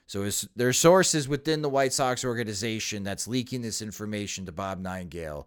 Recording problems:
none

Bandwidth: 18 kHz